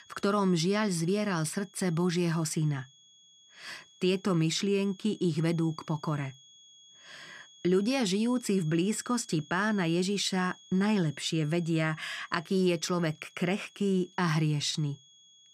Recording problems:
high-pitched whine; faint; throughout; 3.5 kHz, 25 dB below the speech

